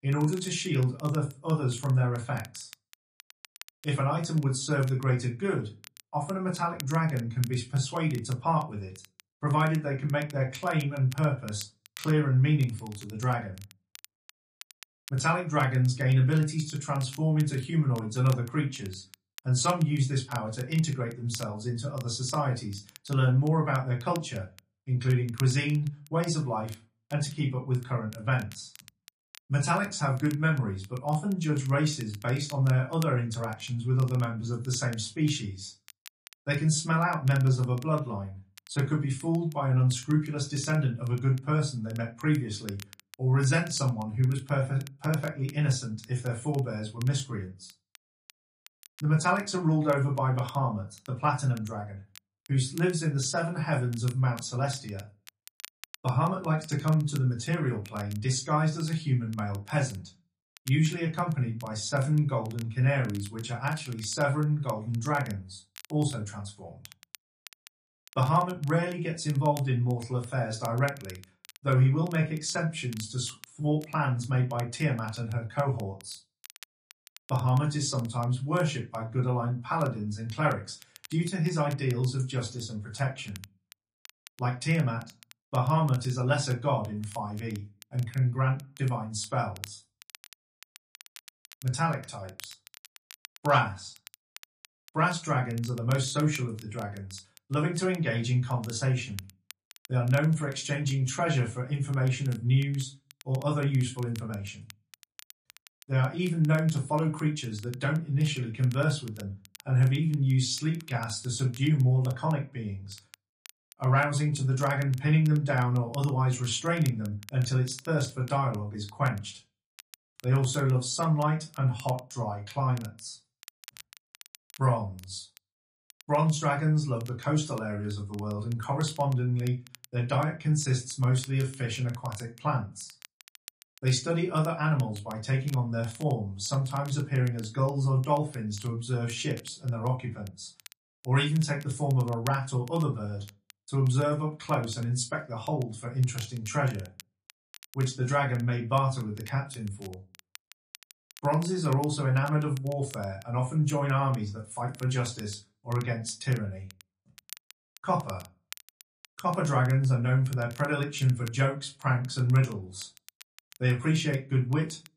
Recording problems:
off-mic speech; far
room echo; very slight; dies away in 0.2 s
garbled, watery; slightly; nothing above 10.5 kHz
crackle, like an old record; faint; 25 dB below the speech

